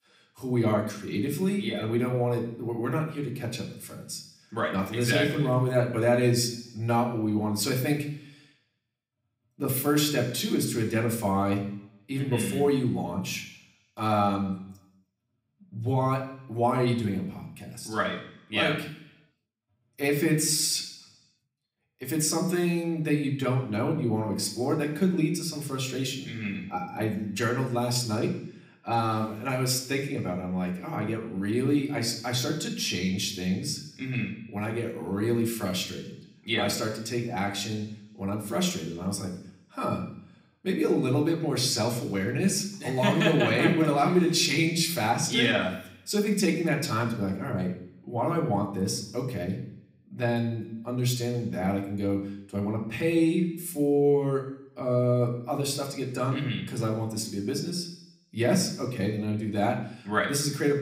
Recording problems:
room echo; slight; dies away in 0.8 s
off-mic speech; somewhat distant

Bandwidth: 15.5 kHz